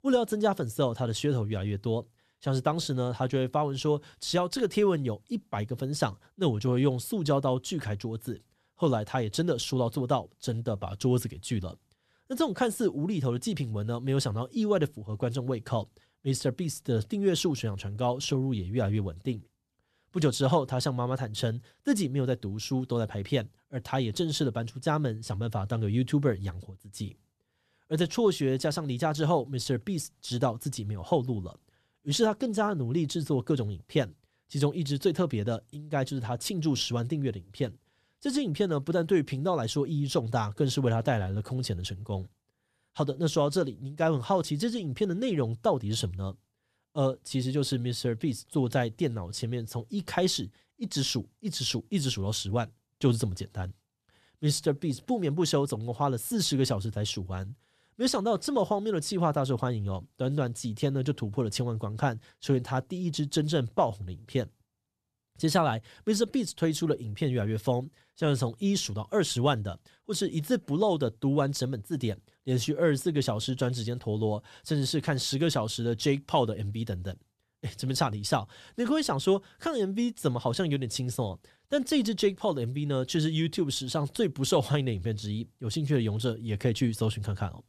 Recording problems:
none

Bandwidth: 13.5 kHz